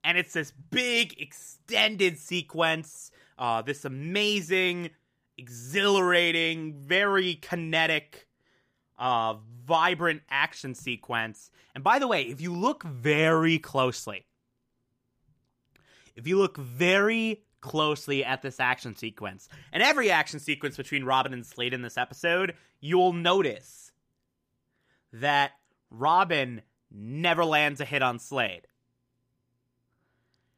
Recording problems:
none

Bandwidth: 15 kHz